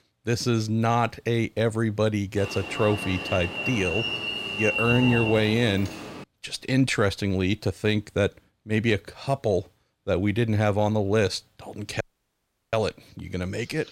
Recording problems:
alarm; loud; from 2.5 to 6 s; peak 2 dB above the speech
audio cutting out; at 12 s for 0.5 s

